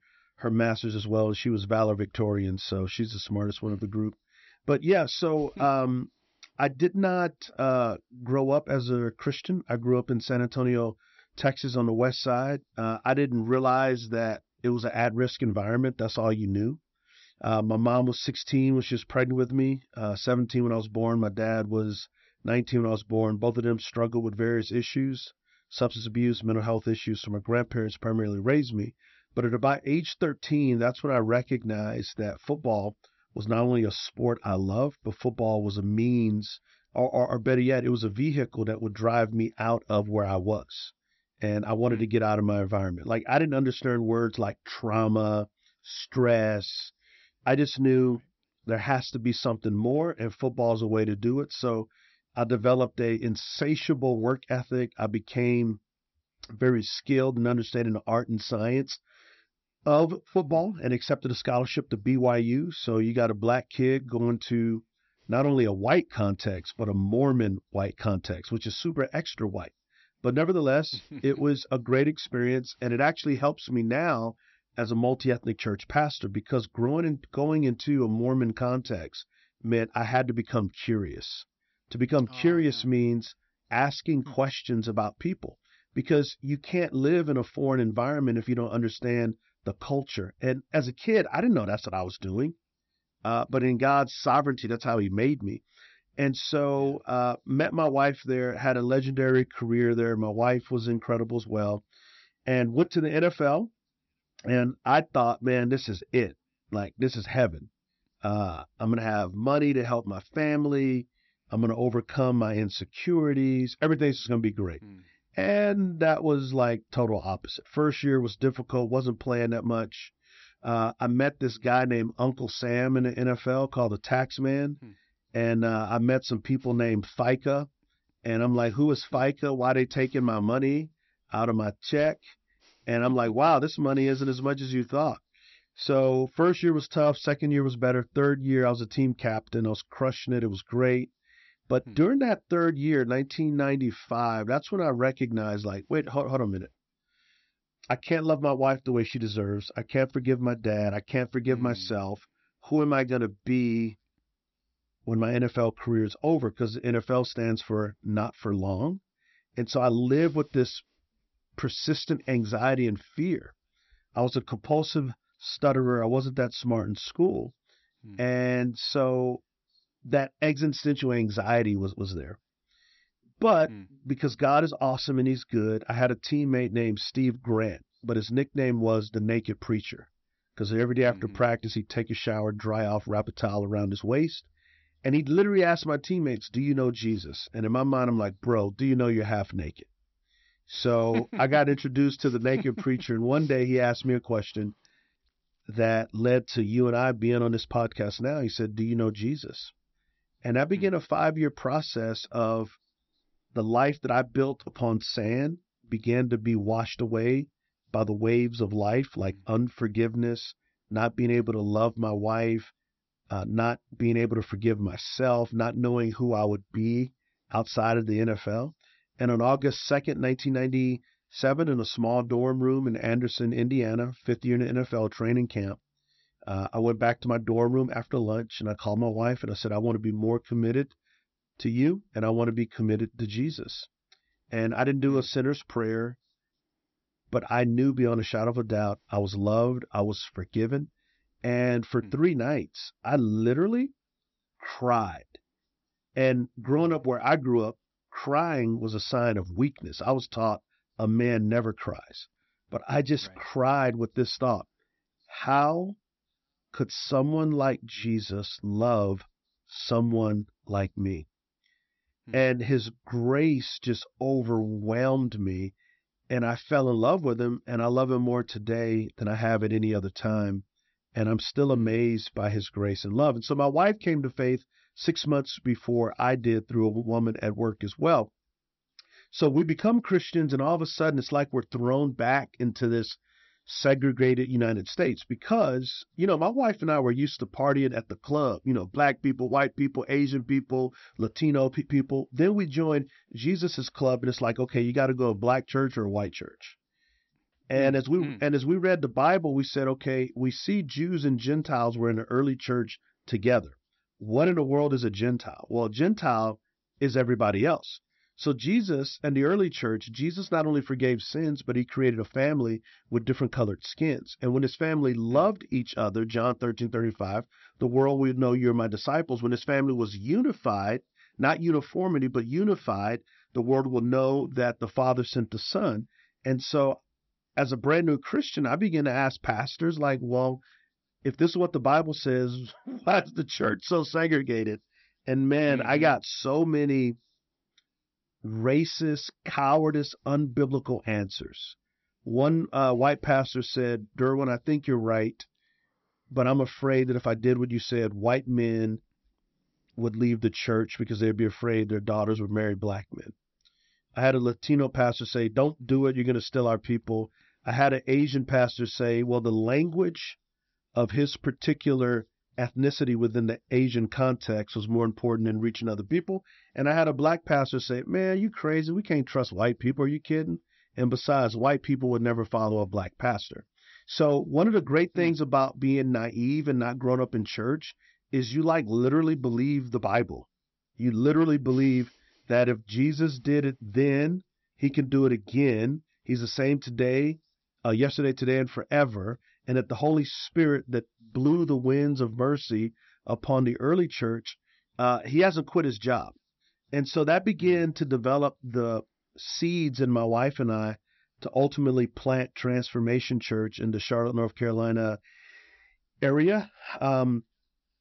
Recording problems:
high frequencies cut off; noticeable; nothing above 5.5 kHz

